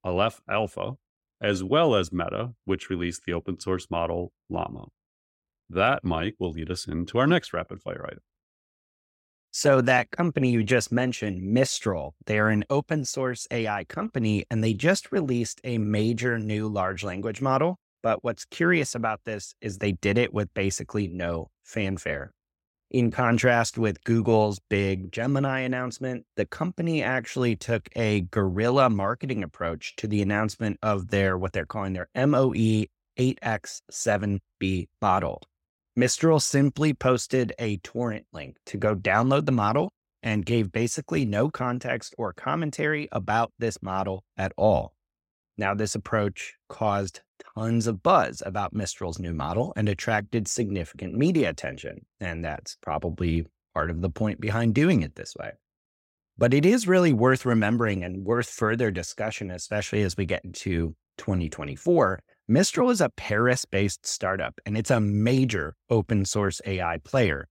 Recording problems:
none

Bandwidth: 16 kHz